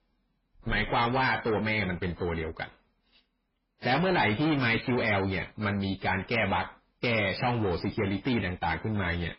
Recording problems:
distortion; heavy; 6 dB below the speech
garbled, watery; badly; nothing above 5.5 kHz

